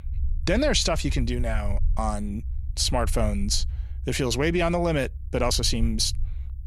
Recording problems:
low rumble; faint; throughout; 25 dB below the speech

